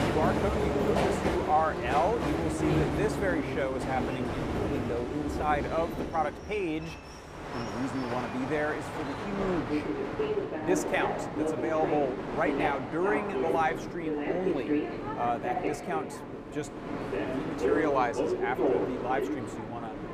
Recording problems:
train or aircraft noise; very loud; throughout; as loud as the speech

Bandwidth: 15 kHz